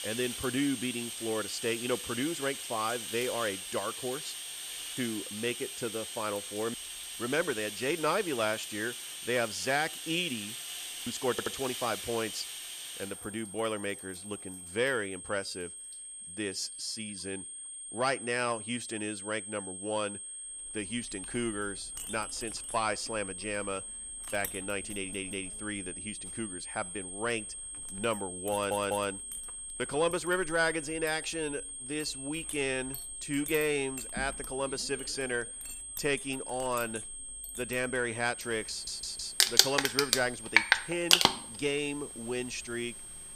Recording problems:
household noises; very loud; throughout; as loud as the speech
high-pitched whine; loud; throughout; 8.5 kHz, 6 dB below the speech
audio stuttering; 4 times, first at 11 s

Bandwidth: 14.5 kHz